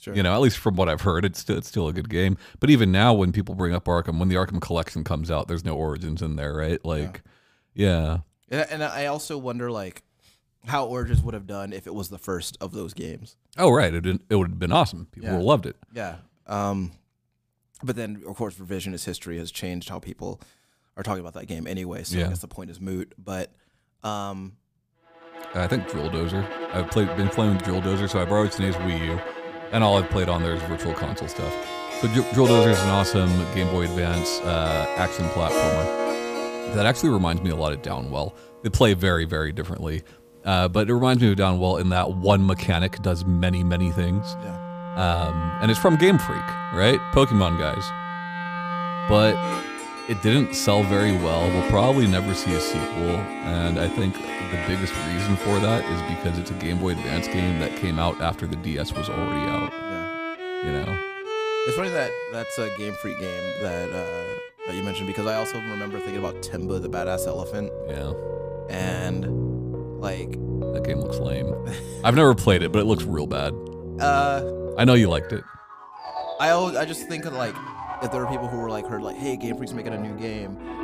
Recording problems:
background music; loud; from 25 s on; 6 dB below the speech

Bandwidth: 15 kHz